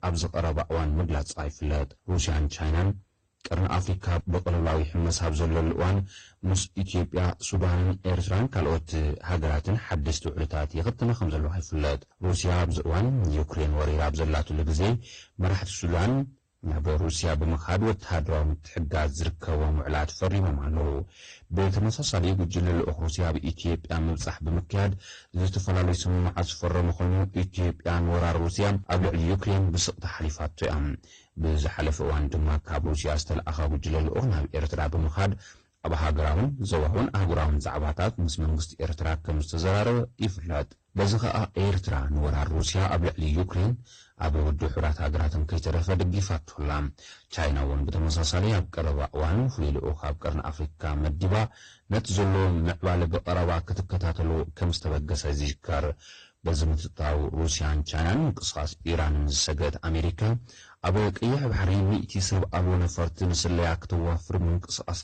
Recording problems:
distortion; heavy; 17% of the sound clipped
garbled, watery; slightly; nothing above 8.5 kHz

